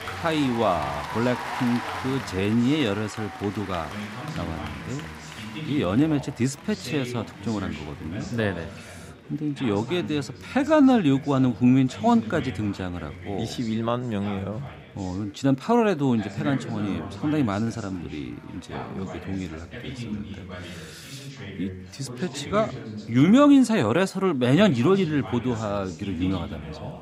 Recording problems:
chatter from many people; noticeable; throughout; 10 dB below the speech

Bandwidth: 15.5 kHz